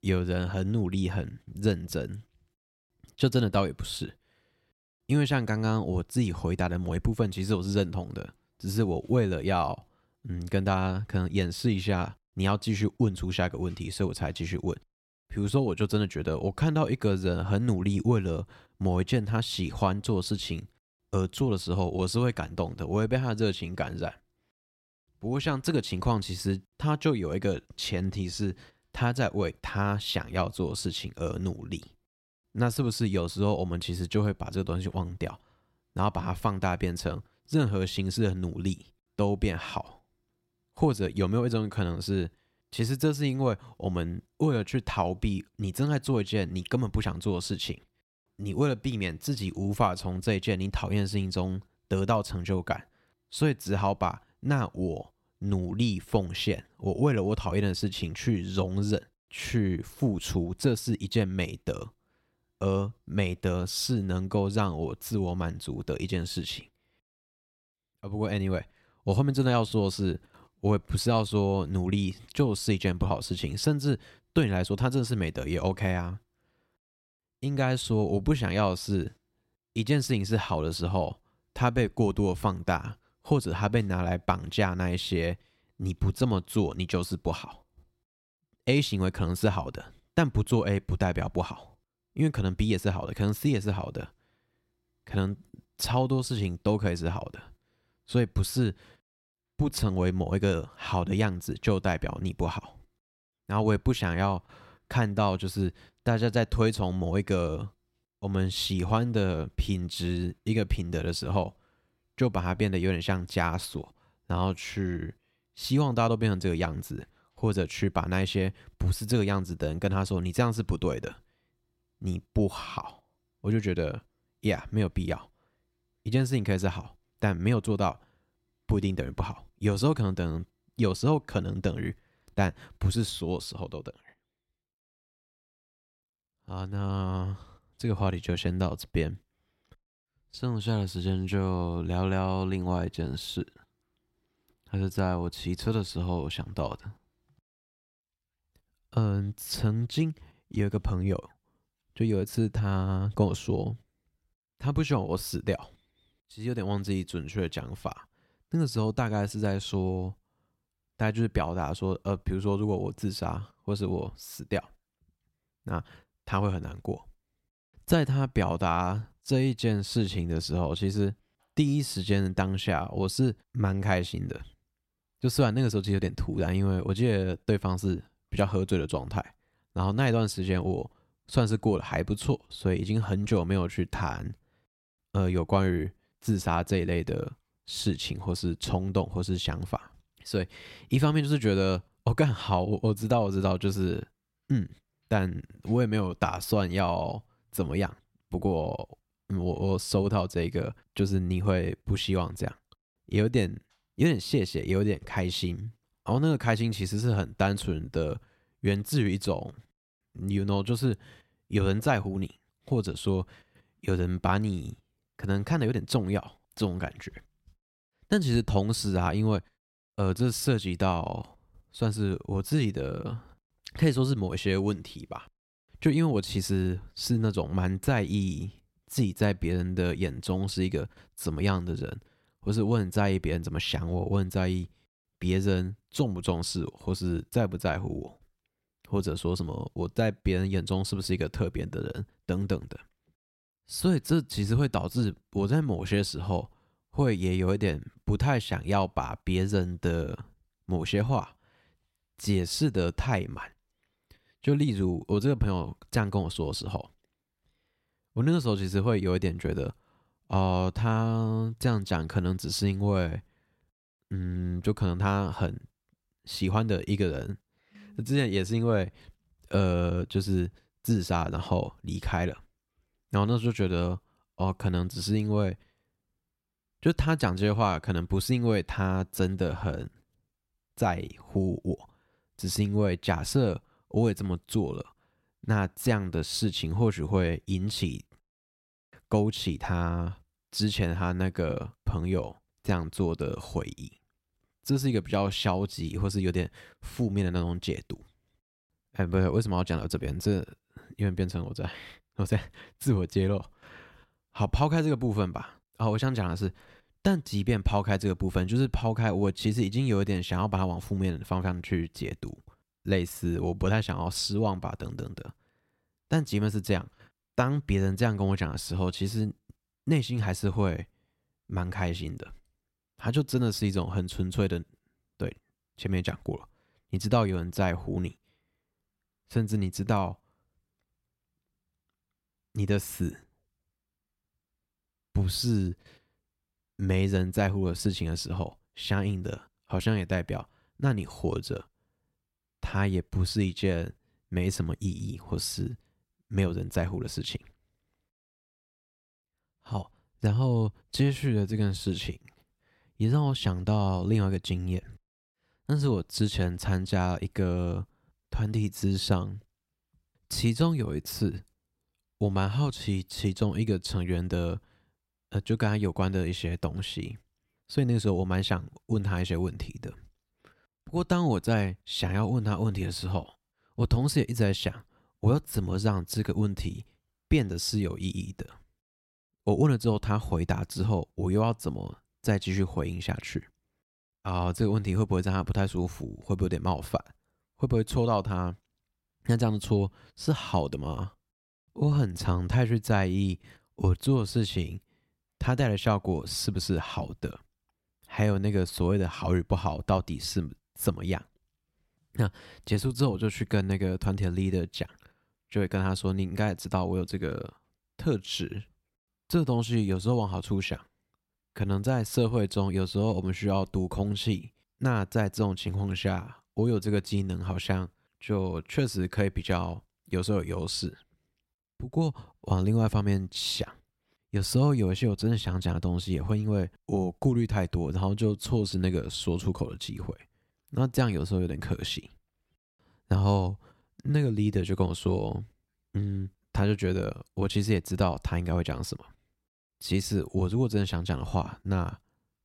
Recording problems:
none

